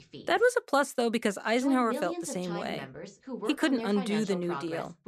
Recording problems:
voice in the background; loud; throughout; 9 dB below the speech

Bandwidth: 14.5 kHz